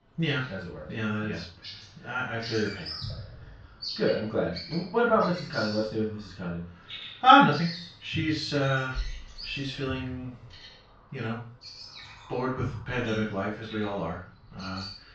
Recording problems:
off-mic speech; far
room echo; noticeable; dies away in 0.3 s
muffled; very slightly; fading above 4.5 kHz
animal sounds; noticeable; throughout; 15 dB below the speech

